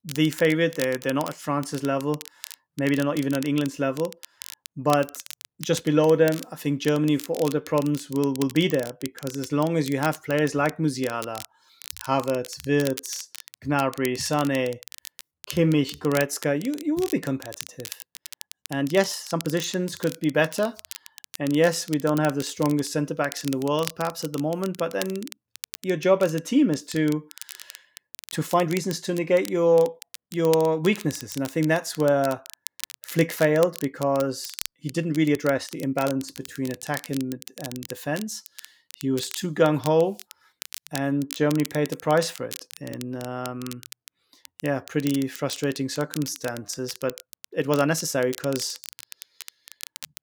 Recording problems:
crackle, like an old record; noticeable; 15 dB below the speech
uneven, jittery; strongly; from 2.5 to 48 s

